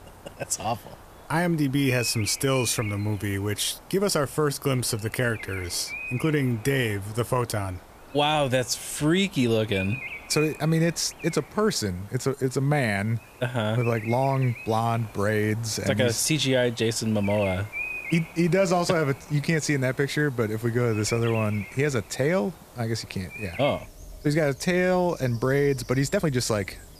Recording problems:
animal sounds; noticeable; throughout; 15 dB below the speech
hiss; faint; throughout; 30 dB below the speech
uneven, jittery; slightly; from 4 to 26 s

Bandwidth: 14.5 kHz